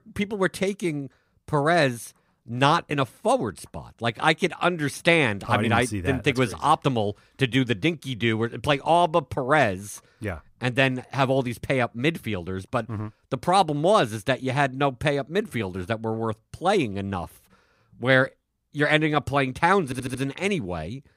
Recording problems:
audio stuttering; at 20 s

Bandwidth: 15.5 kHz